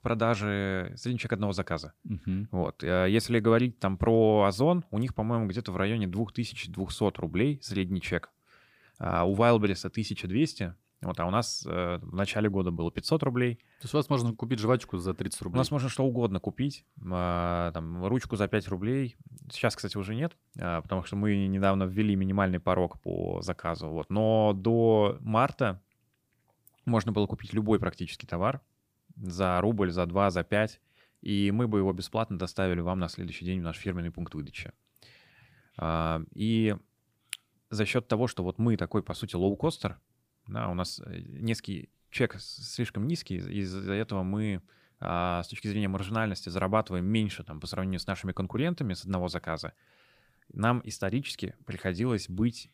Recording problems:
none

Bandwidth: 15 kHz